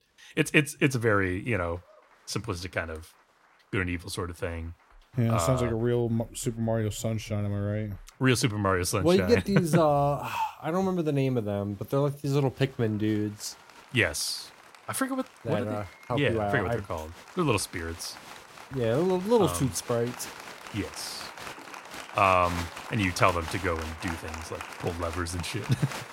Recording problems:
crowd noise; noticeable; throughout; 15 dB below the speech

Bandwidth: 16 kHz